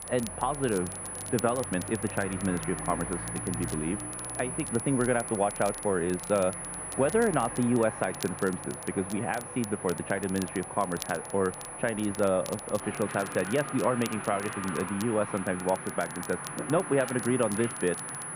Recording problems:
muffled; very; fading above 2 kHz
high-pitched whine; loud; throughout; 10 kHz, 8 dB below the speech
rain or running water; noticeable; throughout; 10 dB below the speech
crackle, like an old record; noticeable; 20 dB below the speech

